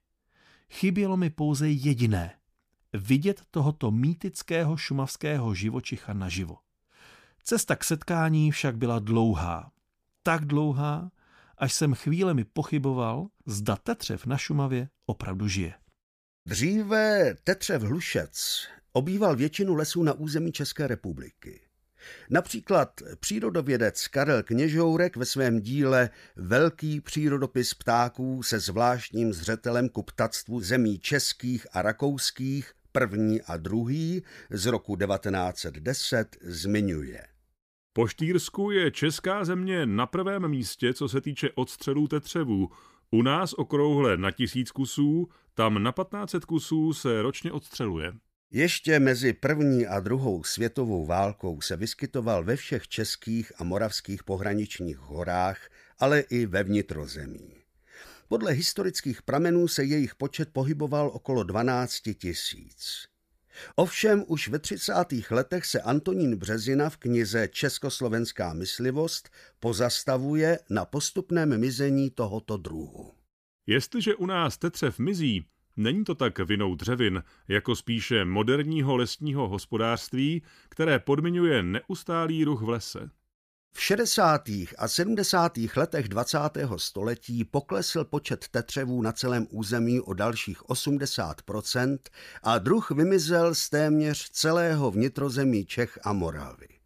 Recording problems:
none

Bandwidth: 15 kHz